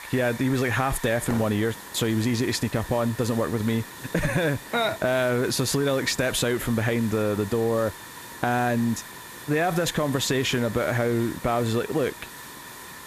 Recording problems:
hiss; noticeable; throughout; 15 dB below the speech

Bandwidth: 14.5 kHz